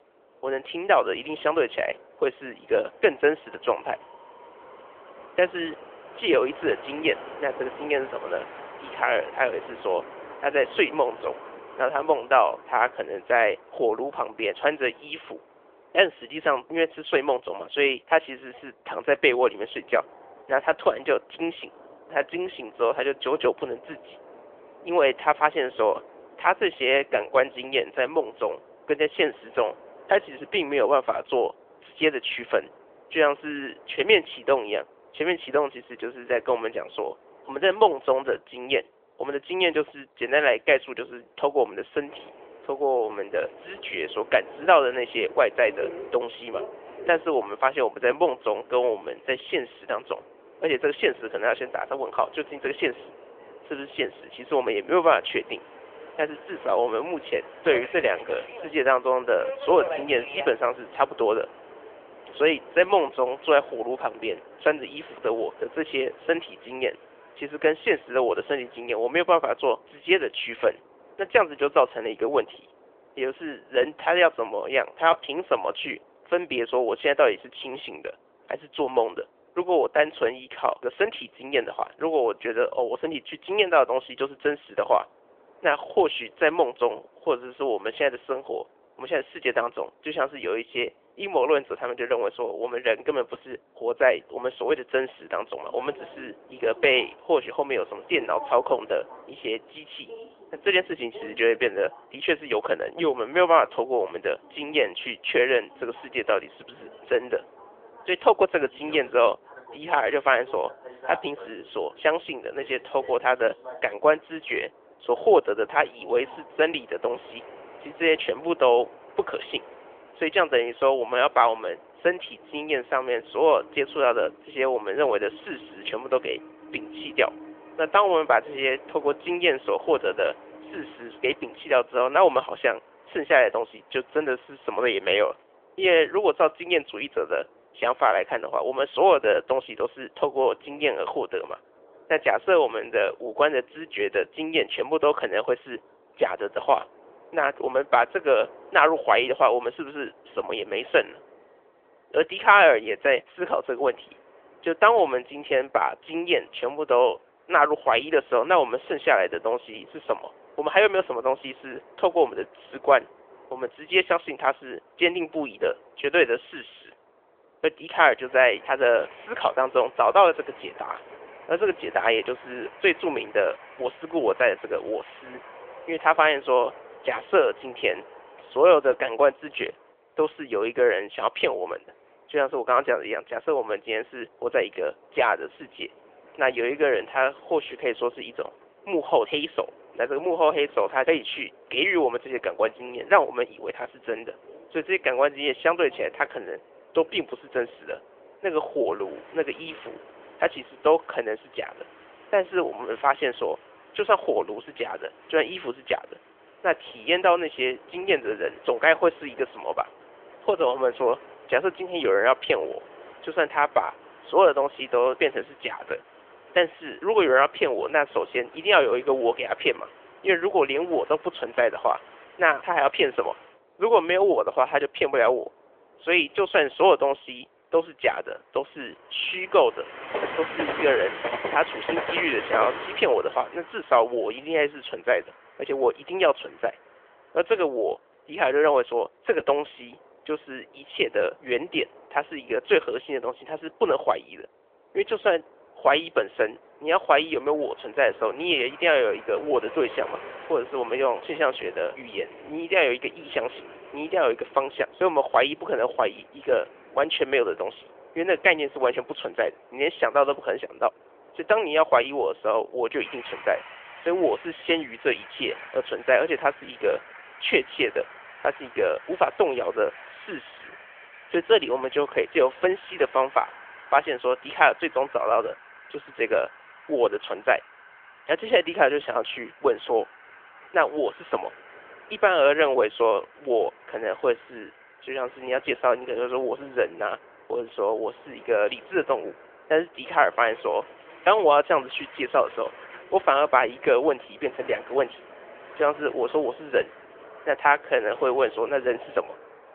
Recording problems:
phone-call audio; nothing above 3.5 kHz
train or aircraft noise; noticeable; throughout; 20 dB below the speech

